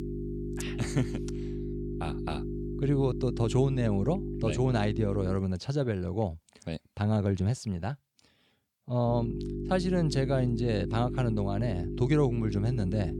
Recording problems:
electrical hum; loud; until 5.5 s and from 9 s on; 50 Hz, 7 dB below the speech

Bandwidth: 18.5 kHz